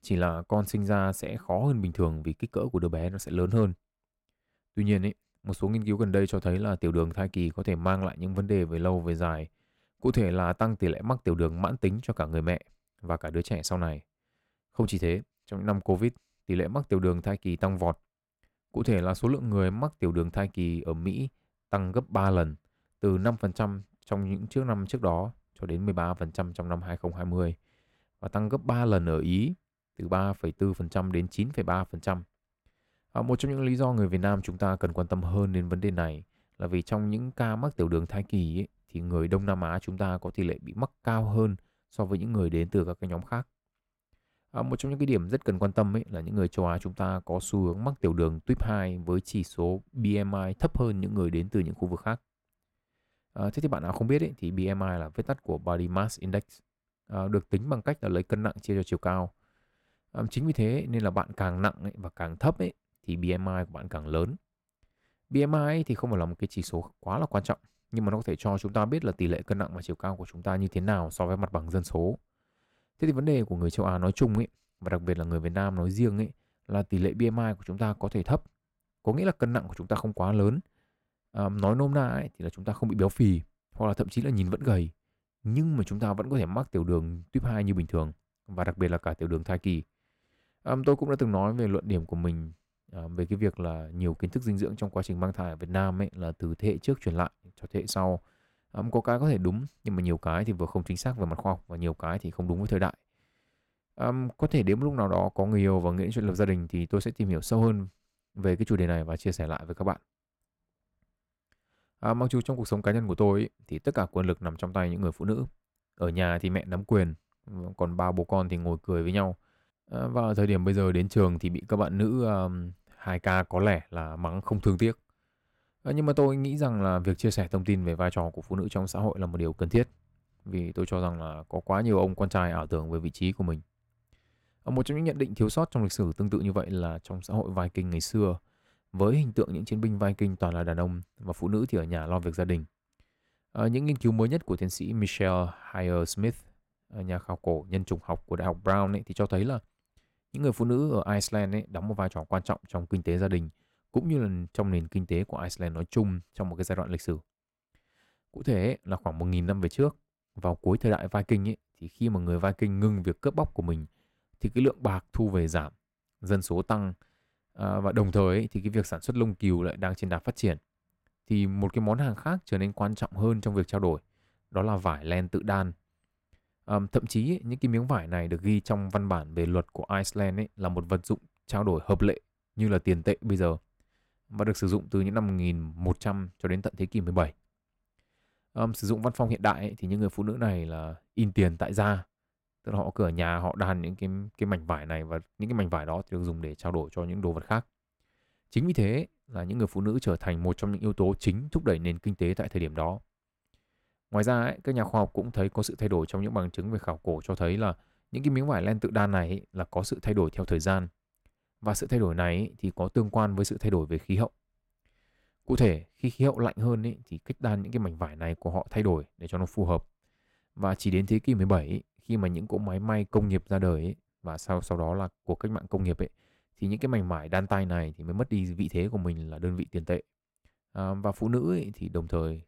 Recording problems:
none

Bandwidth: 16 kHz